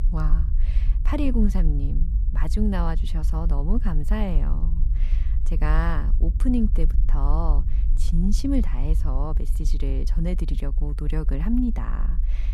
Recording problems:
low rumble; noticeable; throughout; 15 dB below the speech

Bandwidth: 14.5 kHz